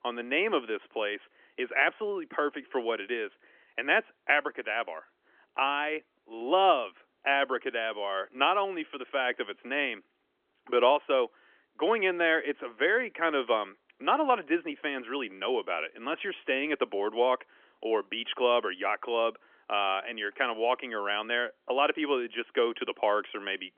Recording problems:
phone-call audio; nothing above 3.5 kHz

